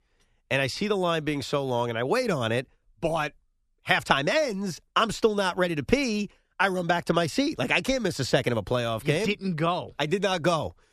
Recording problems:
none

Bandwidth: 13.5 kHz